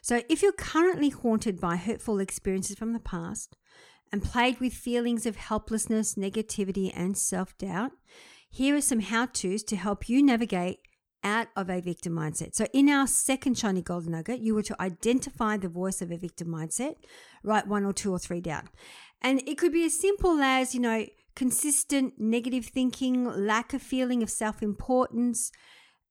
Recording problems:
none

